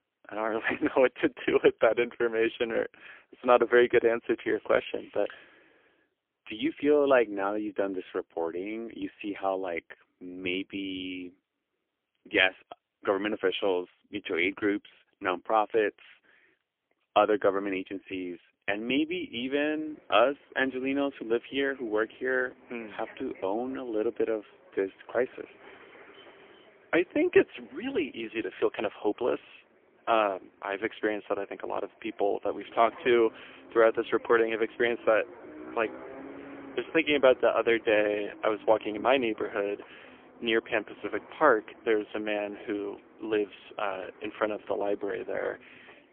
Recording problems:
phone-call audio; poor line; nothing above 3.5 kHz
traffic noise; faint; from 19 s on; 20 dB below the speech

